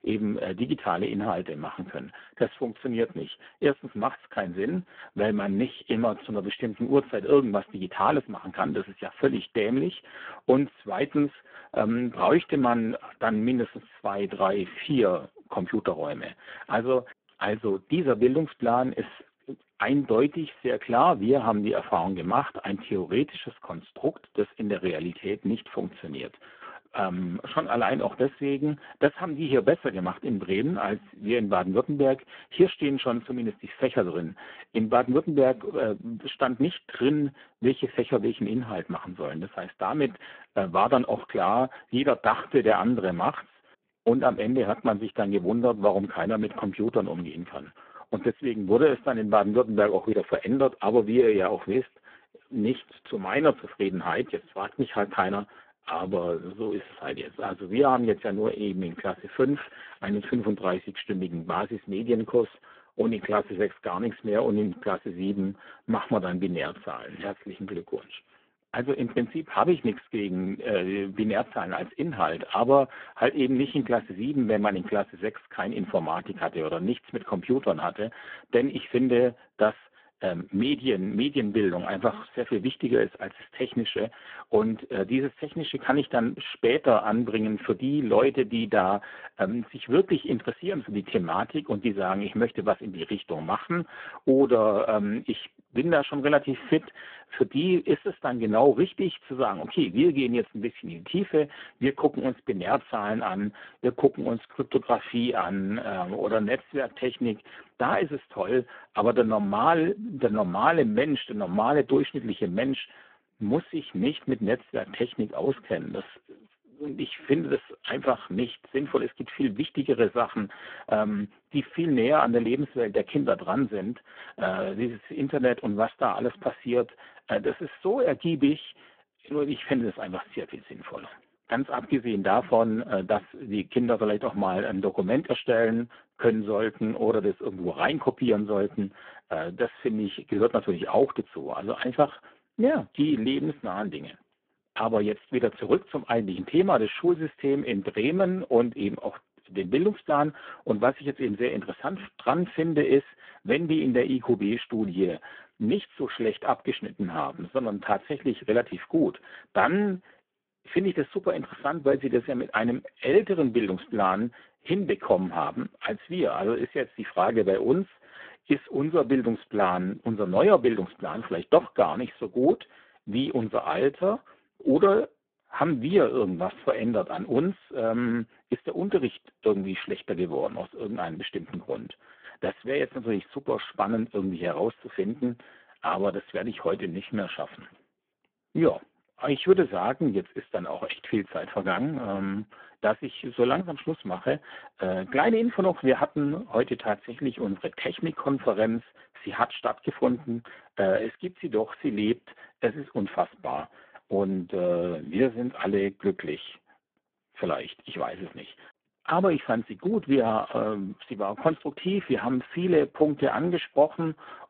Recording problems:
phone-call audio; poor line

